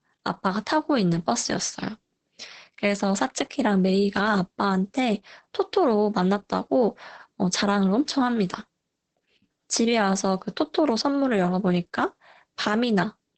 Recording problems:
garbled, watery; badly; nothing above 8 kHz

